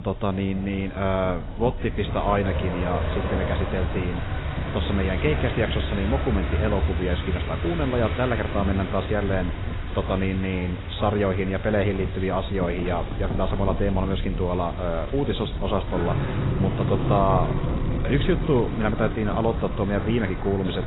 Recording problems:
garbled, watery; badly; nothing above 4 kHz
traffic noise; loud; throughout; 4 dB below the speech
wind noise on the microphone; occasional gusts; 15 dB below the speech

